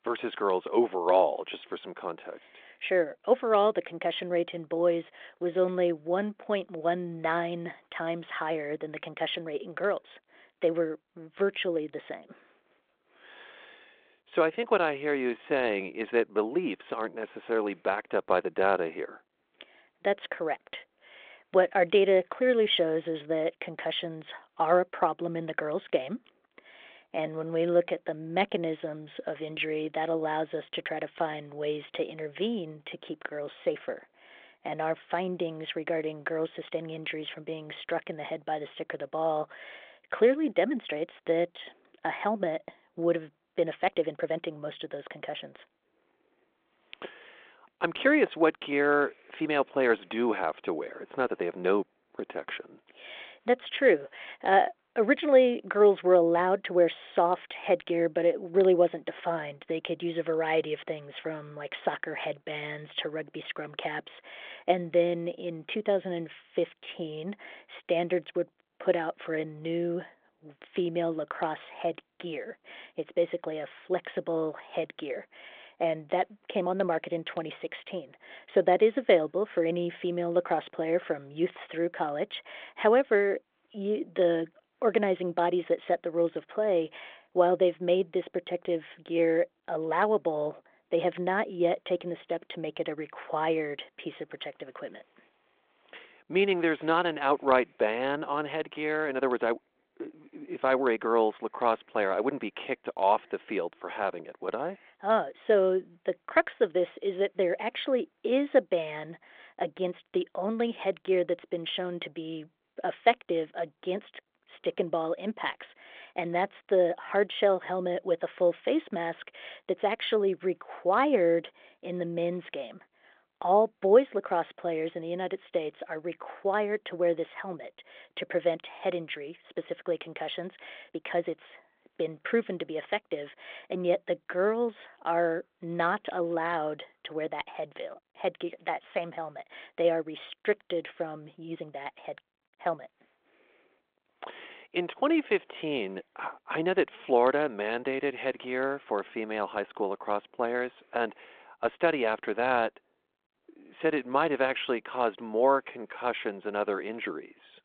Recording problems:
phone-call audio
uneven, jittery; strongly; from 5.5 s to 2:36

